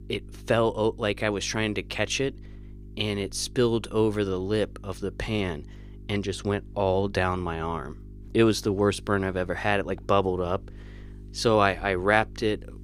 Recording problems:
electrical hum; faint; throughout; 50 Hz, 30 dB below the speech

